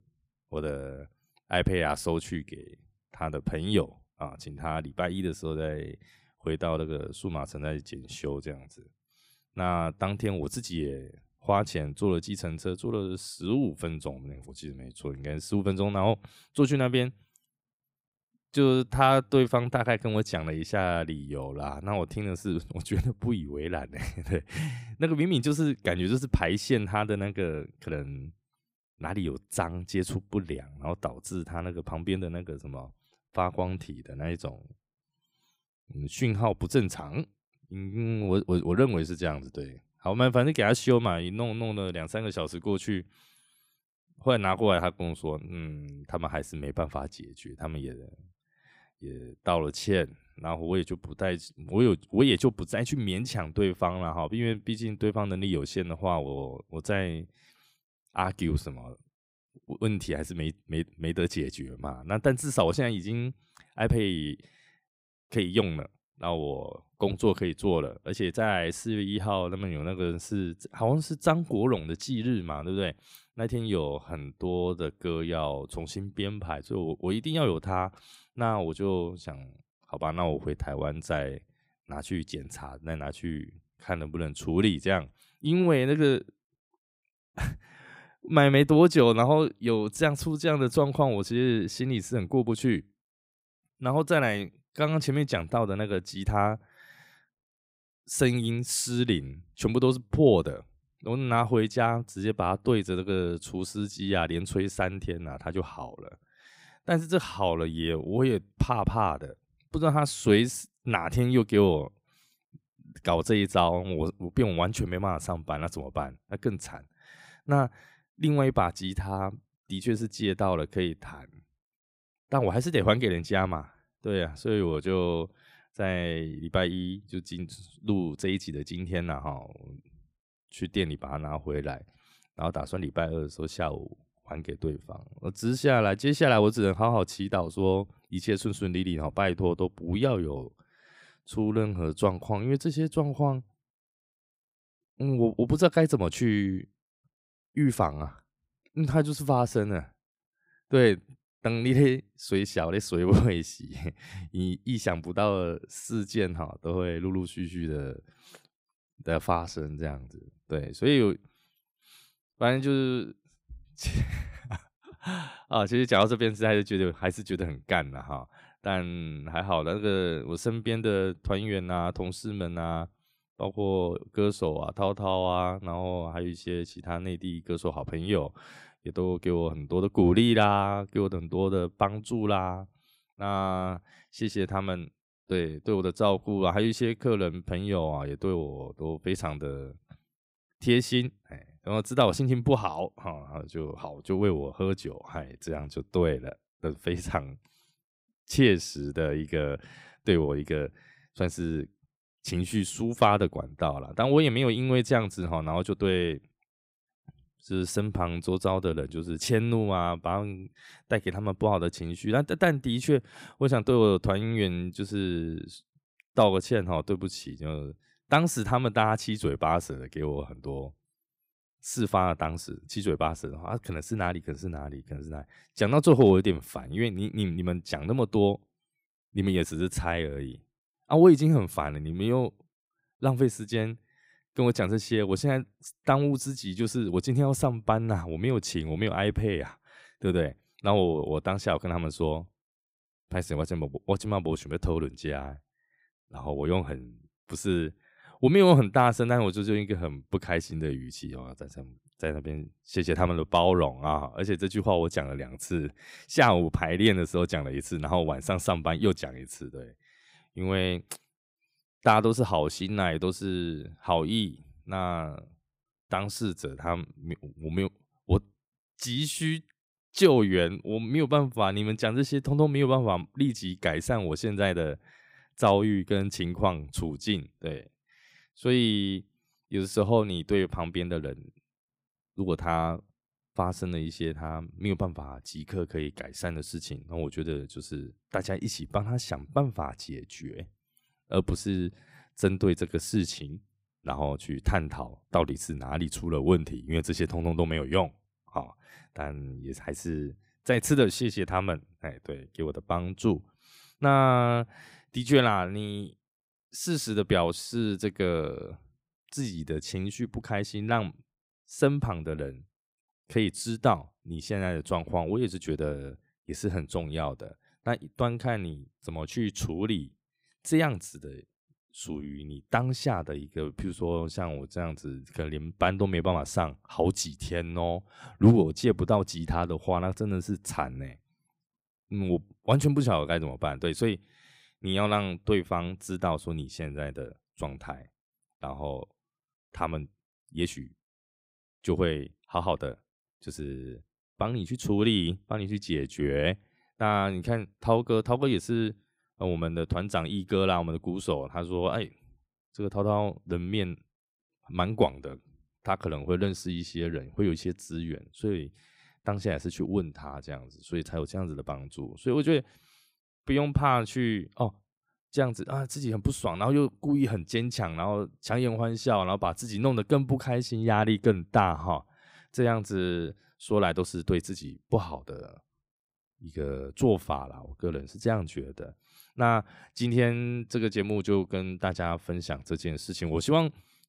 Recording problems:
none

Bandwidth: 15.5 kHz